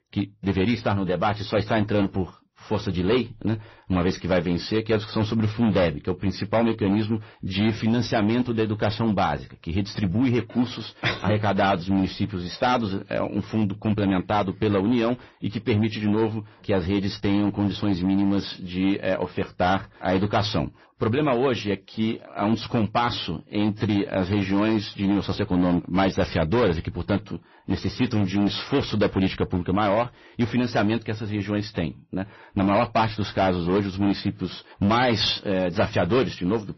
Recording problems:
distortion; slight; 7% of the sound clipped
garbled, watery; slightly; nothing above 6 kHz

